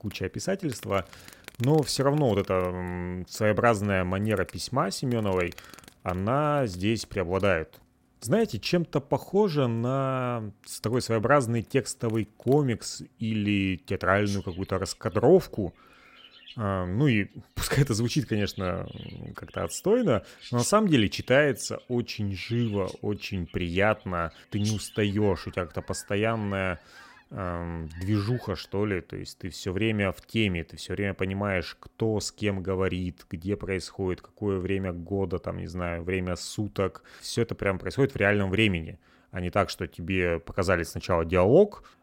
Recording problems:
animal sounds; faint; until 29 s; 20 dB below the speech

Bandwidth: 16 kHz